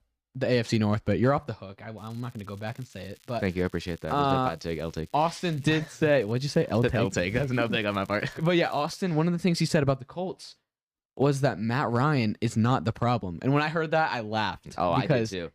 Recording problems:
crackling; faint; from 2 to 4 s and from 4.5 to 9 s; 30 dB below the speech

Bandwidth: 15 kHz